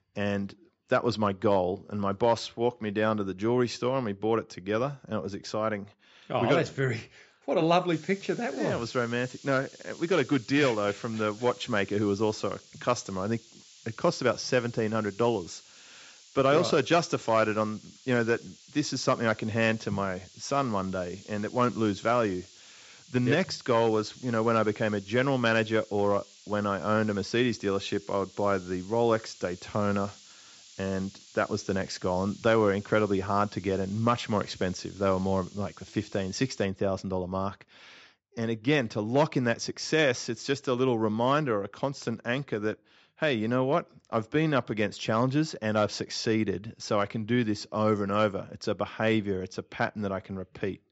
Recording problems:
high frequencies cut off; noticeable; nothing above 7.5 kHz
hiss; faint; from 8 to 37 s; 20 dB below the speech

